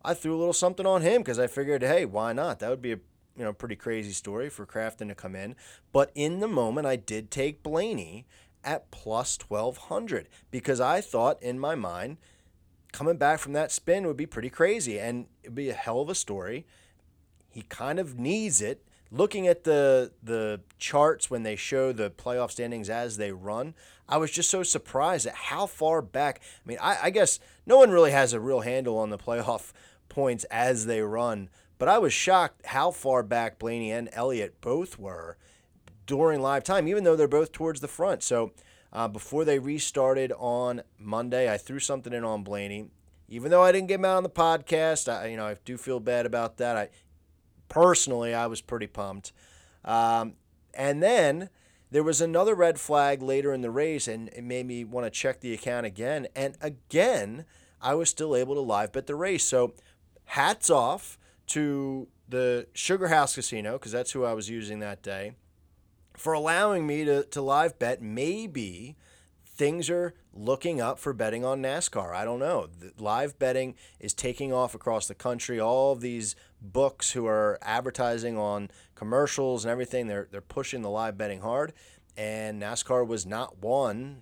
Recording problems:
none

